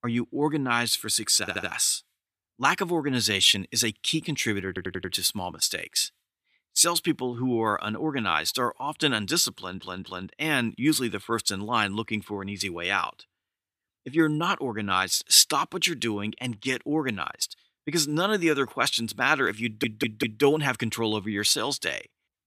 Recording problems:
audio stuttering; 4 times, first at 1.5 s

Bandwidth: 14.5 kHz